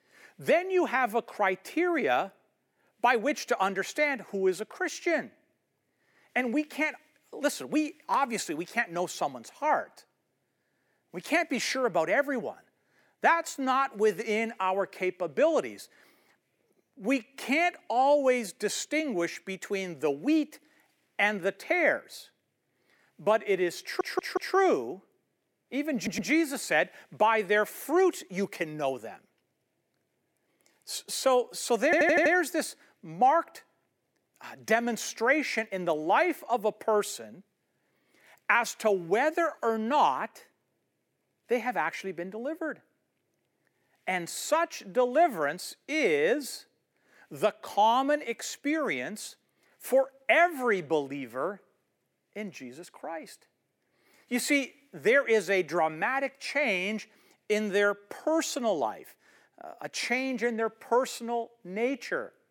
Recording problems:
thin; very slightly; fading below 350 Hz
audio stuttering; at 24 s, at 26 s and at 32 s

